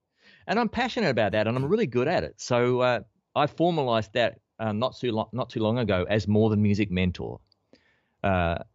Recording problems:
none

